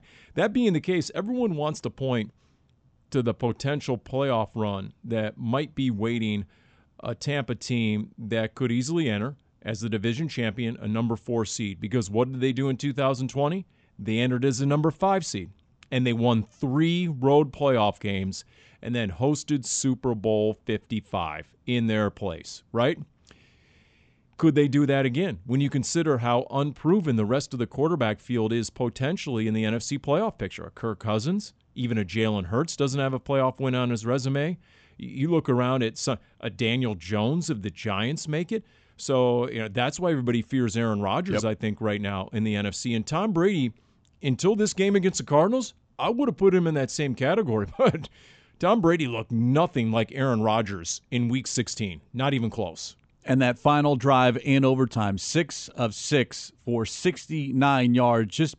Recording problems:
high frequencies cut off; noticeable; nothing above 8 kHz

